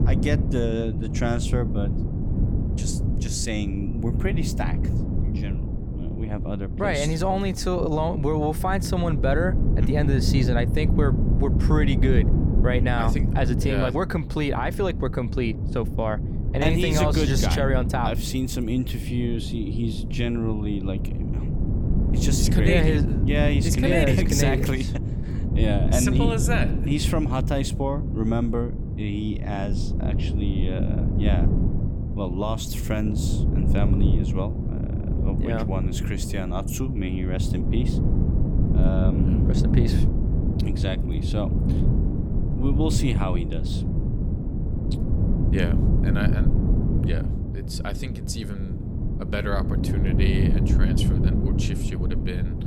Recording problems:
wind noise on the microphone; heavy; 6 dB below the speech

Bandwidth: 17.5 kHz